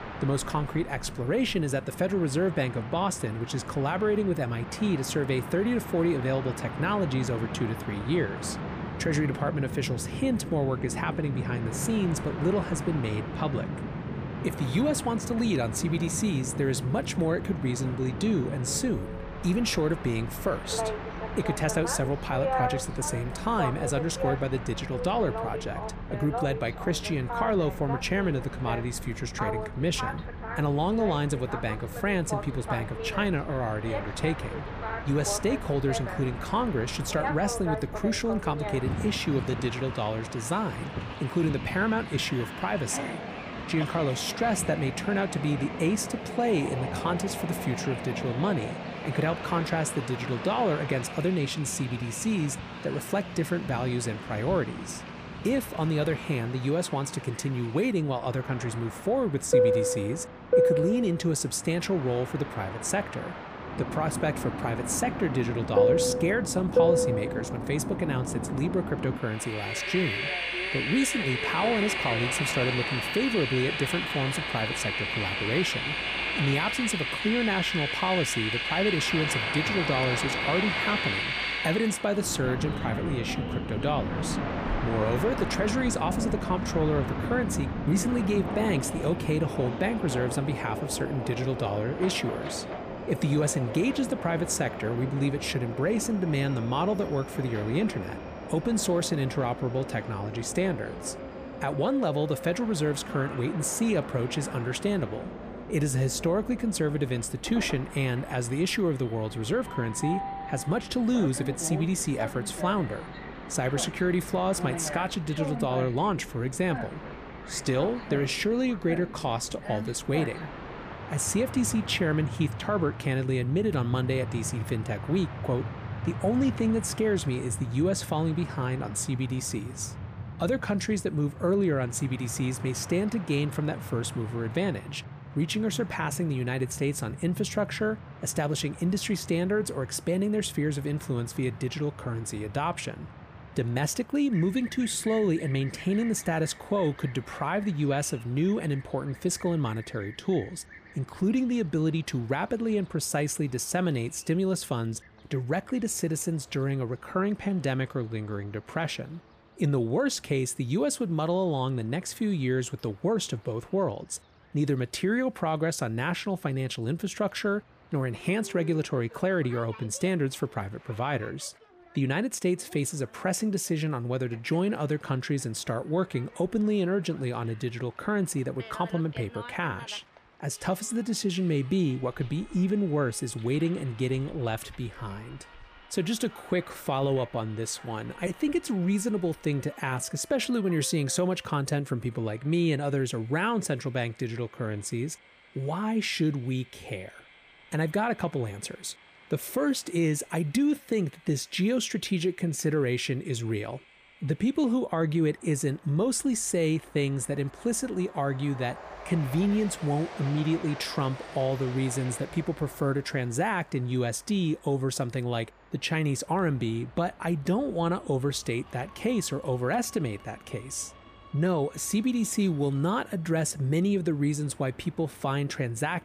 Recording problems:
train or aircraft noise; loud; throughout; 5 dB below the speech

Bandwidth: 15 kHz